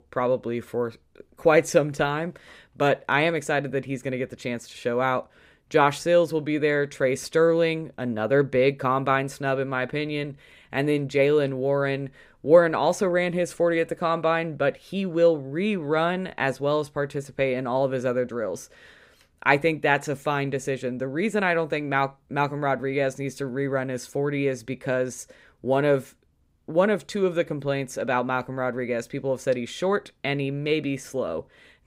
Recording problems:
none

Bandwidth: 15.5 kHz